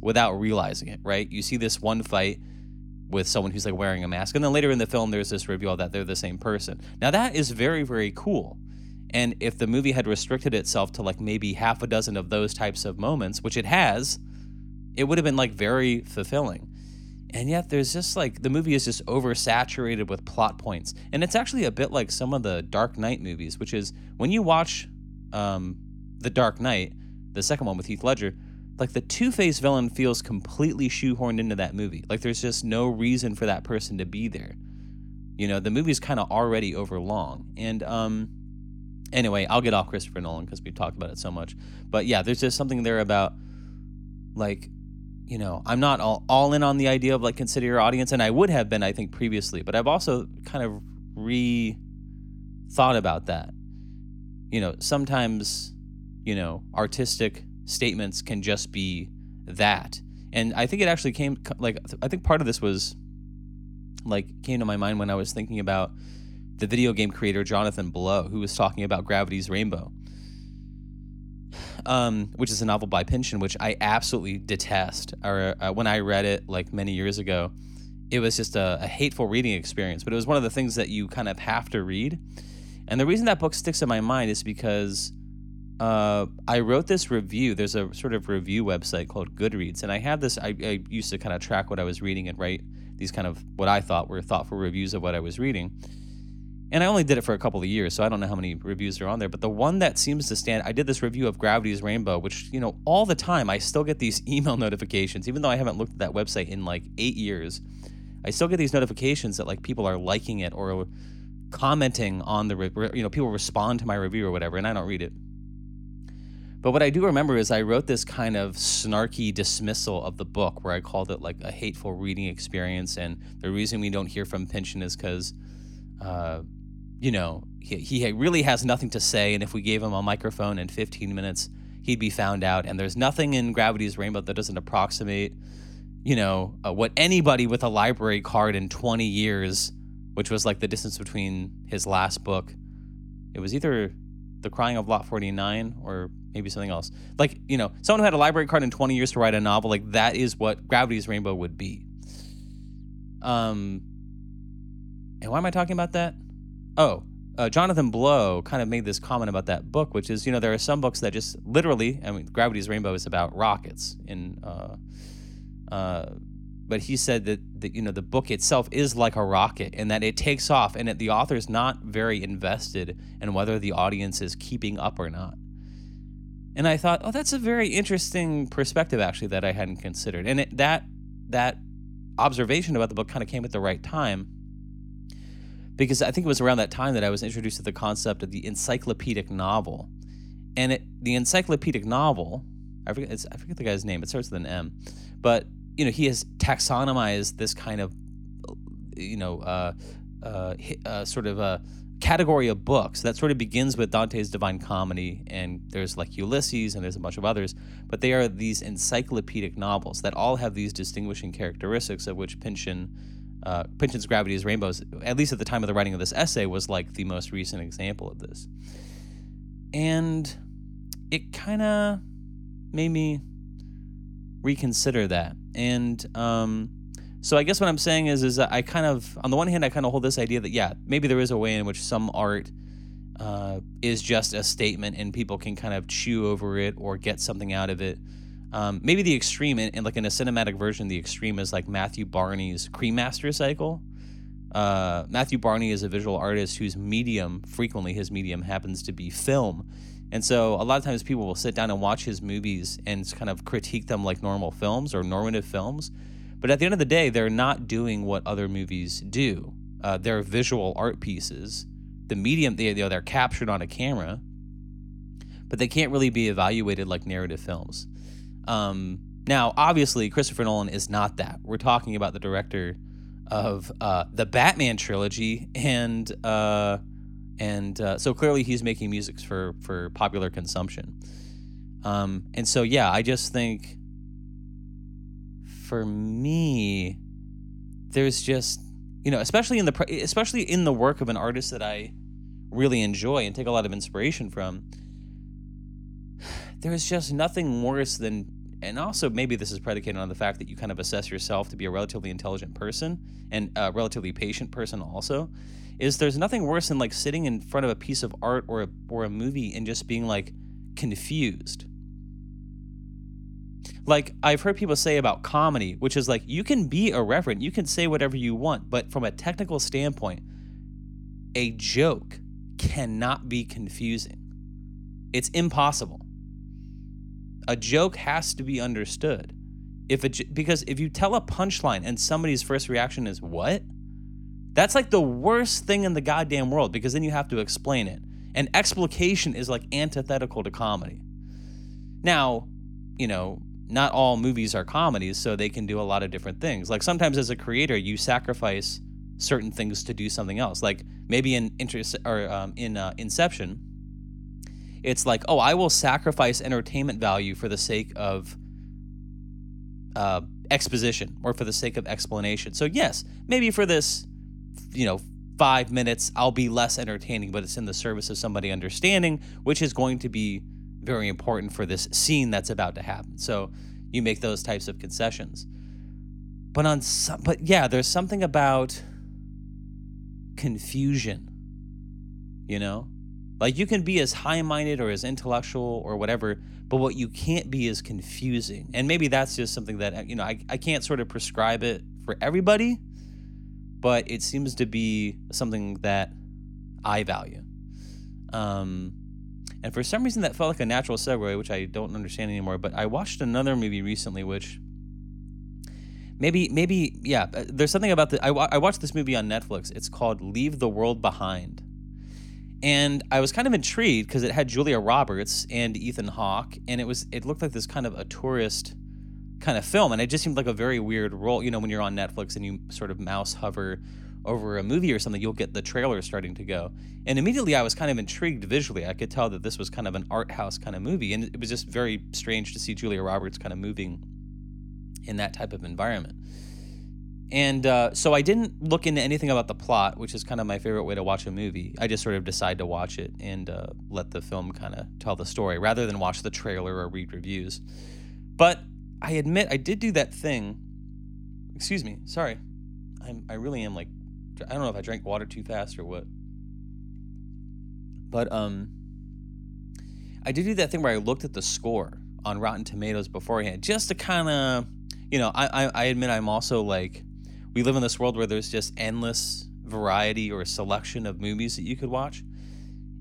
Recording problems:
electrical hum; faint; throughout; 50 Hz, 25 dB below the speech

